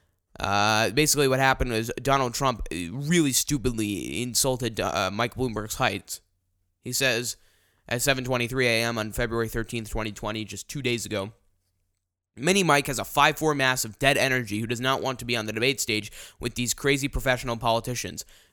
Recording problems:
none

